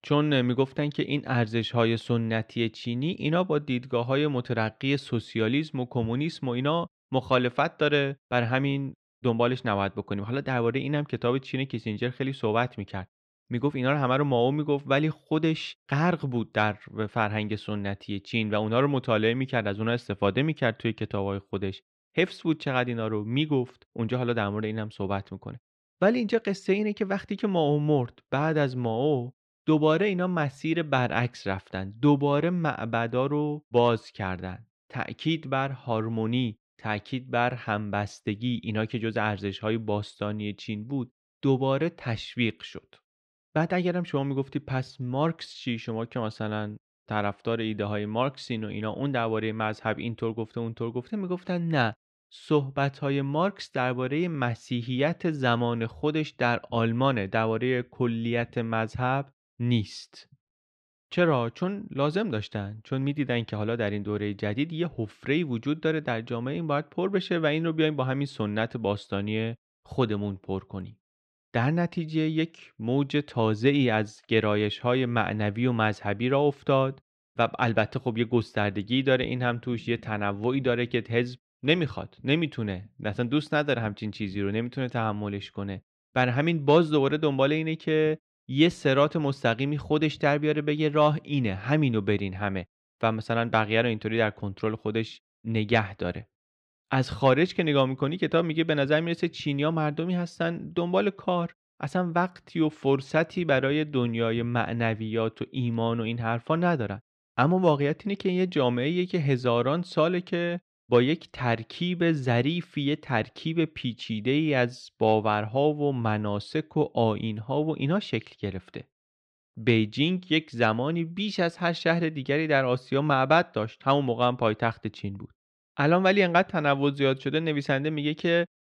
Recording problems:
muffled; very slightly; fading above 3 kHz

